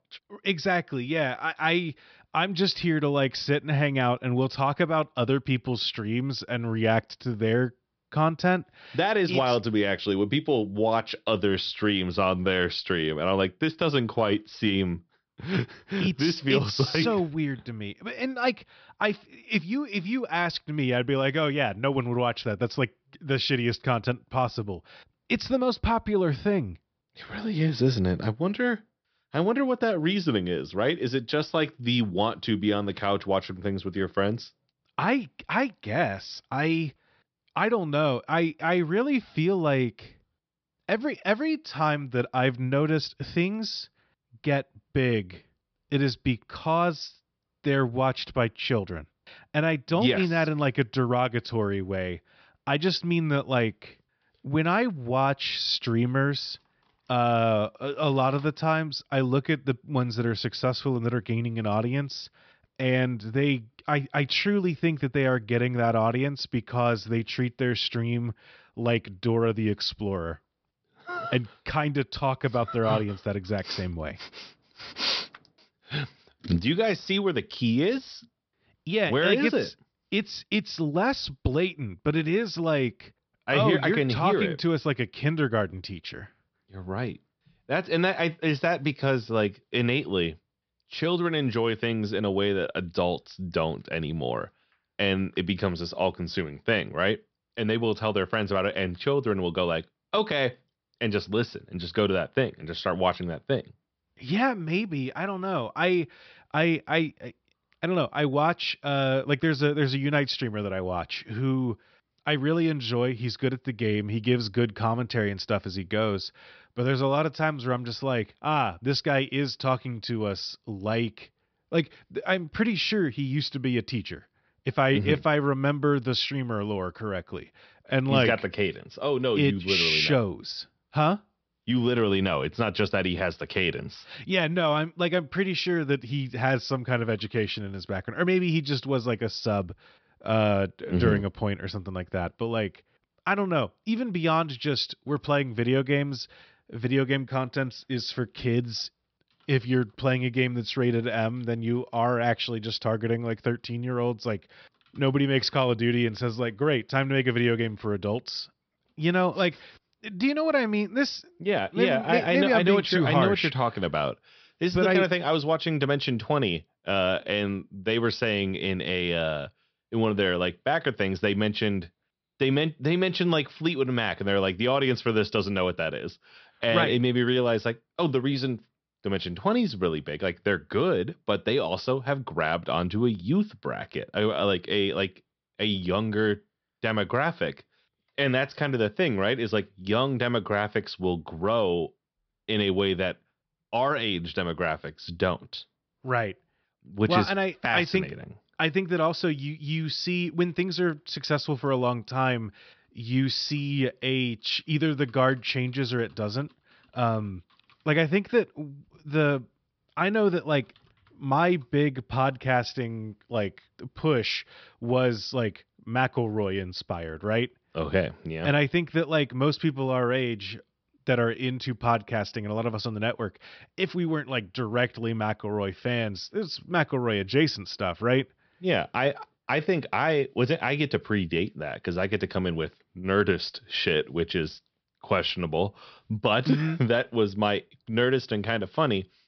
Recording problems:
high frequencies cut off; noticeable; nothing above 5.5 kHz

